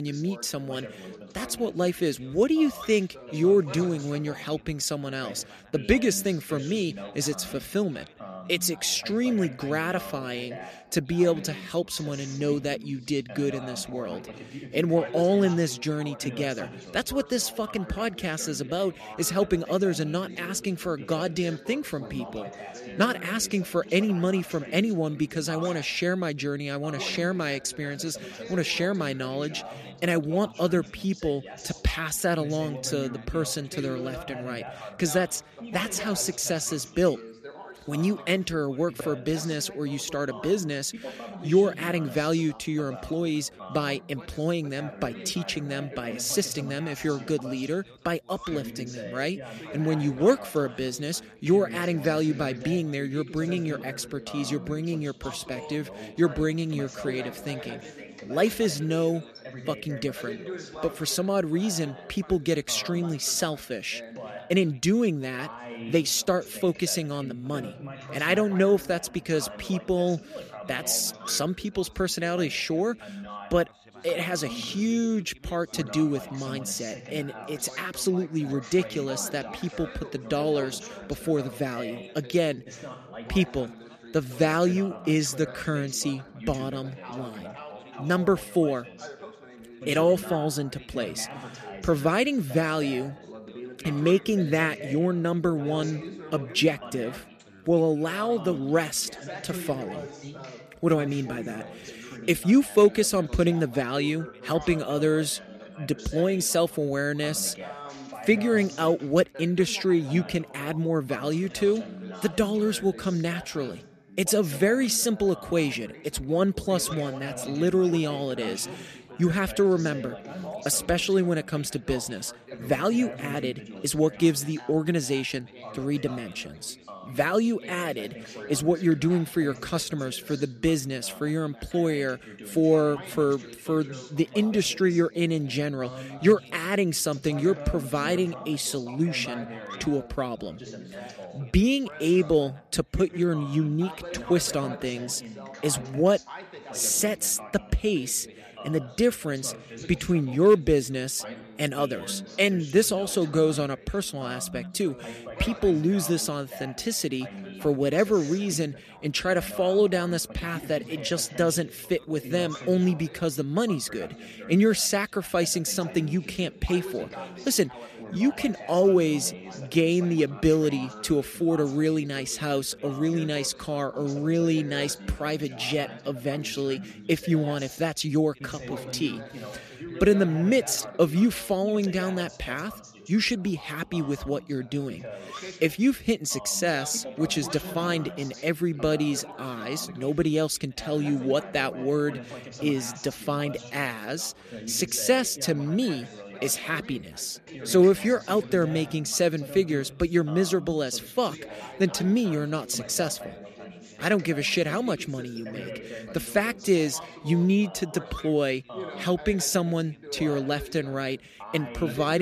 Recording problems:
background chatter; noticeable; throughout; 3 voices, 15 dB below the speech
abrupt cut into speech; at the start and the end

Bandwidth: 14.5 kHz